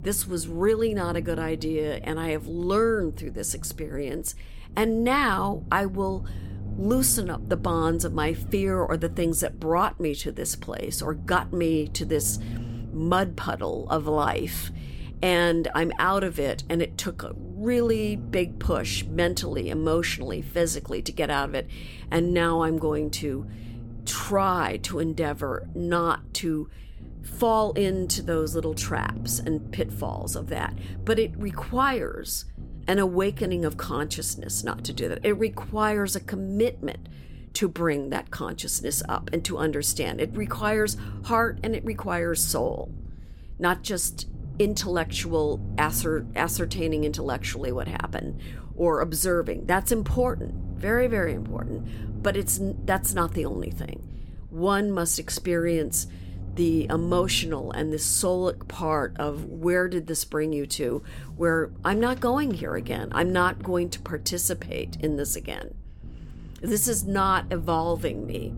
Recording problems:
low rumble; faint; throughout; 20 dB below the speech

